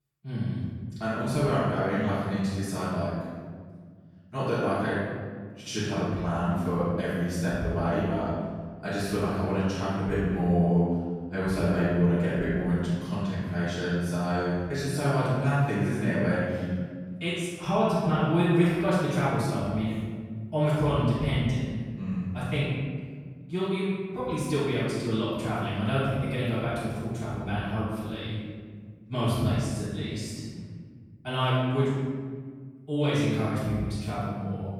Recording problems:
room echo; strong; dies away in 1.7 s
off-mic speech; far

